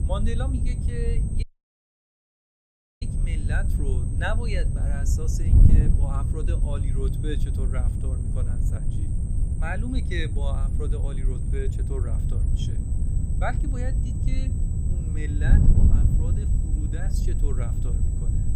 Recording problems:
wind noise on the microphone; heavy; 3 dB below the speech
high-pitched whine; noticeable; throughout; 8 kHz, 10 dB below the speech
low rumble; faint; throughout; 25 dB below the speech
audio cutting out; at 1.5 s for 1.5 s

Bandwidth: 15.5 kHz